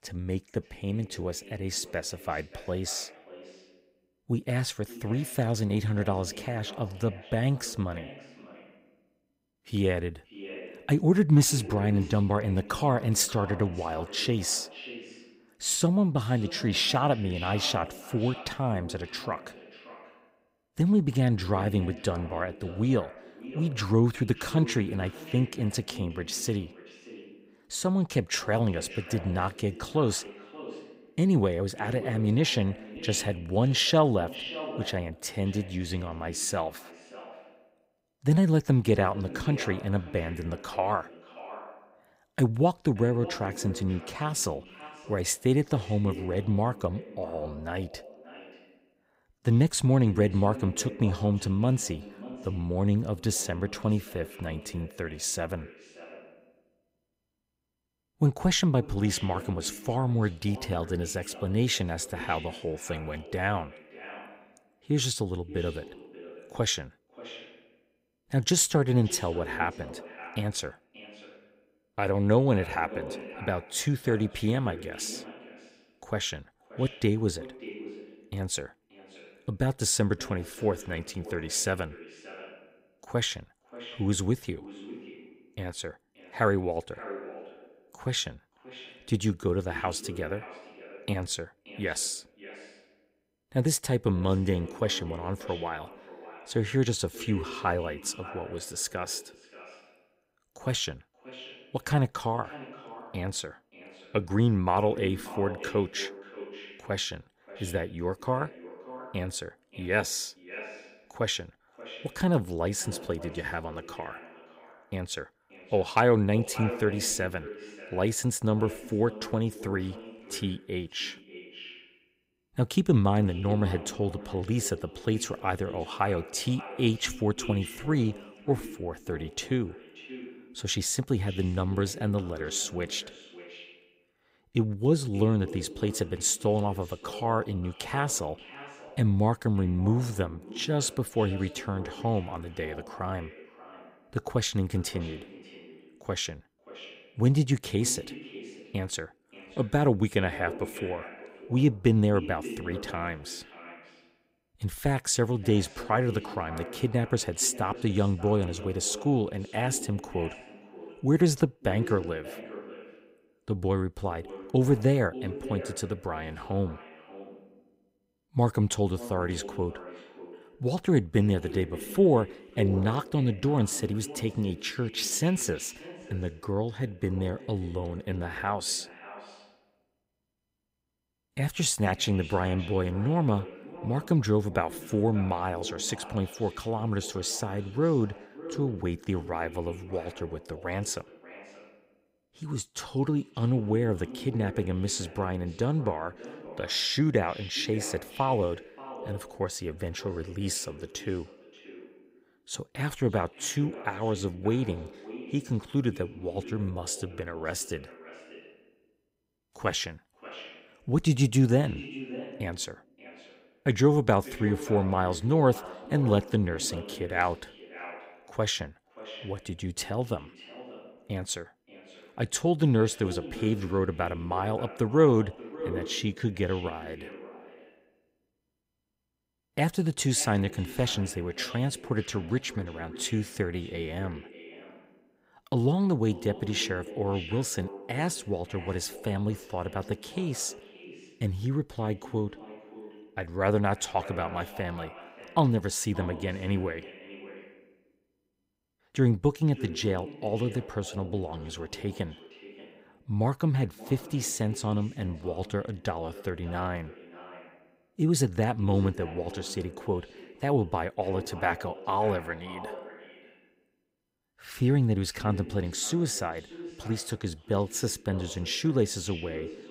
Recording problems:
echo of what is said; noticeable; throughout; 580 ms later, 15 dB below the speech

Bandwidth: 15.5 kHz